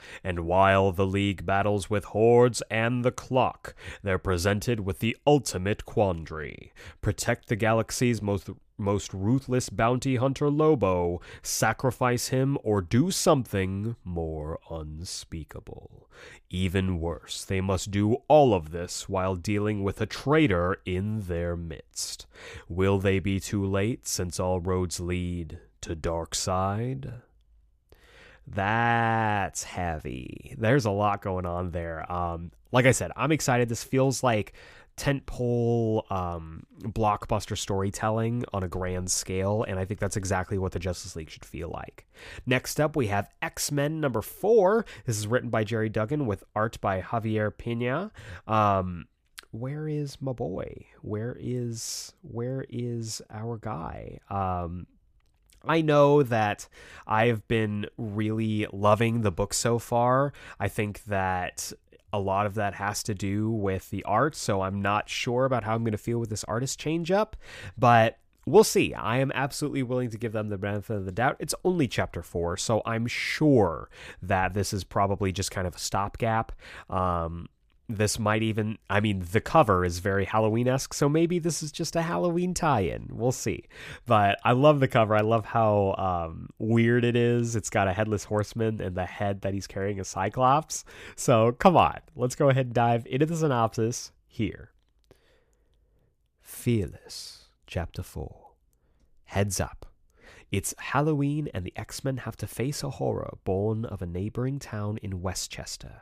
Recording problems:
none

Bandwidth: 15 kHz